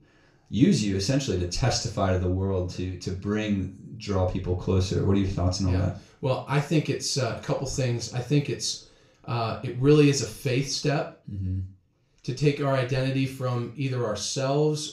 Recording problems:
off-mic speech; far
room echo; slight; dies away in 0.3 s

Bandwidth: 15.5 kHz